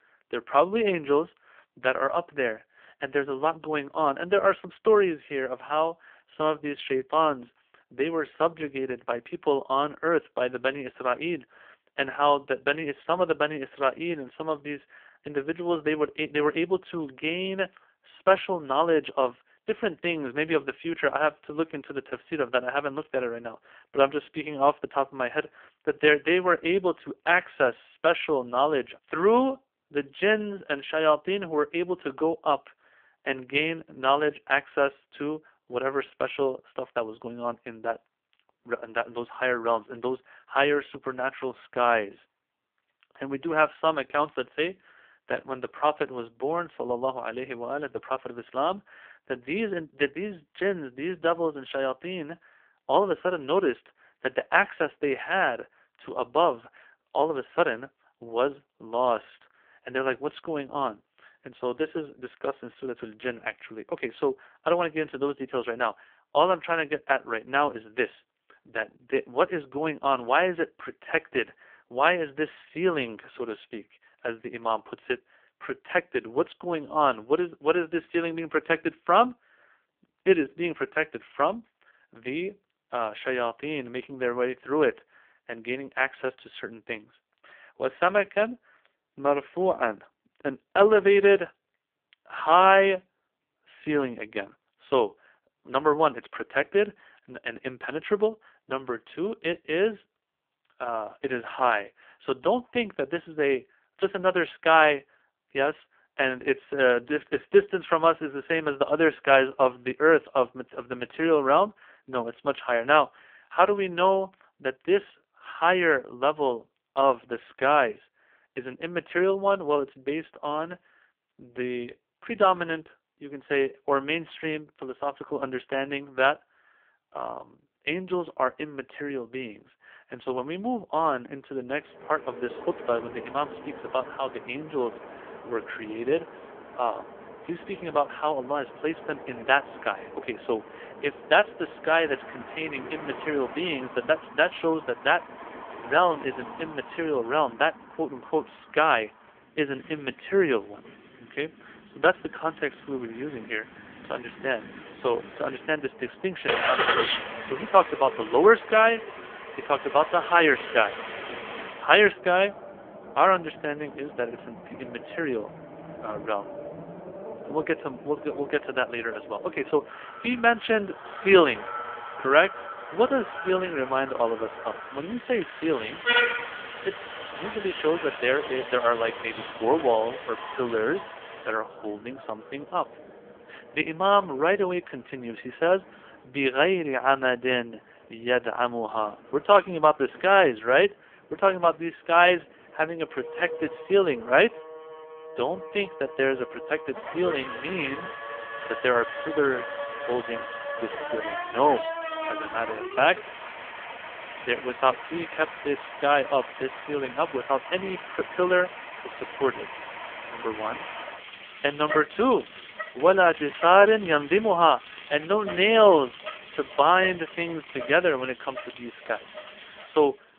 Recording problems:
phone-call audio; poor line; nothing above 3 kHz
traffic noise; noticeable; from 2:12 on; 10 dB below the speech

